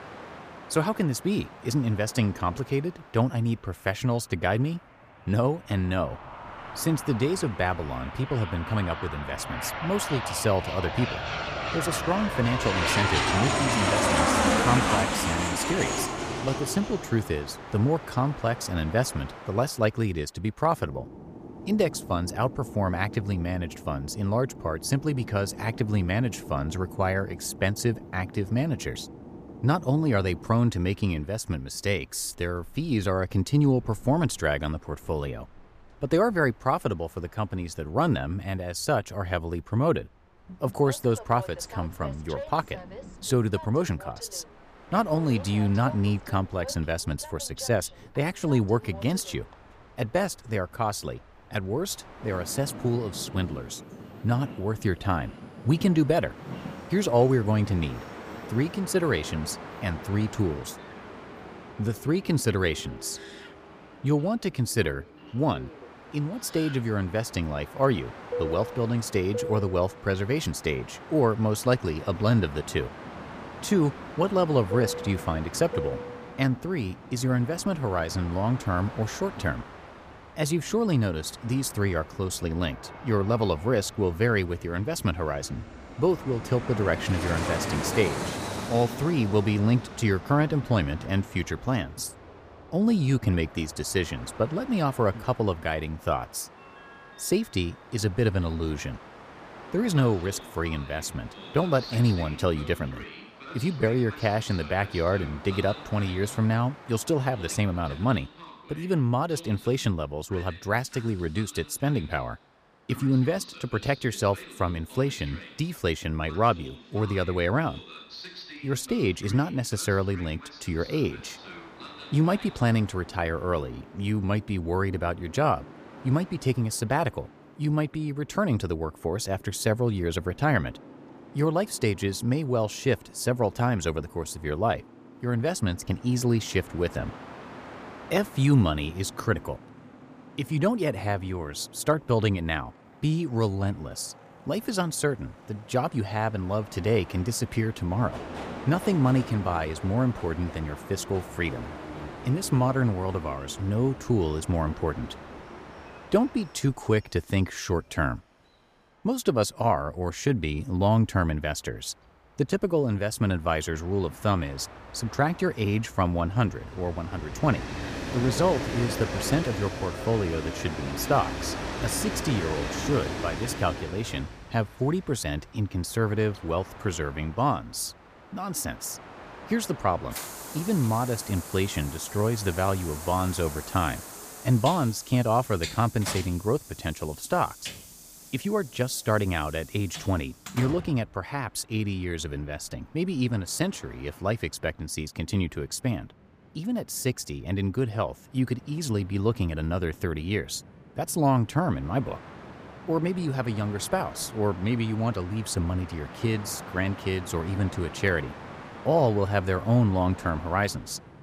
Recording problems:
train or aircraft noise; loud; throughout; 10 dB below the speech

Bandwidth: 15 kHz